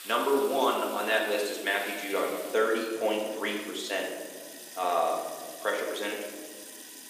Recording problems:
off-mic speech; far
room echo; noticeable; dies away in 1.6 s
thin; somewhat; fading below 350 Hz
household noises; noticeable; throughout; 15 dB below the speech

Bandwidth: 15 kHz